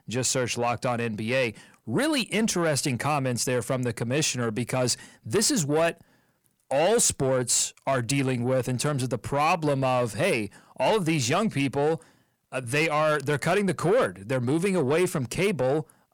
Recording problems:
distortion; slight; 10 dB below the speech

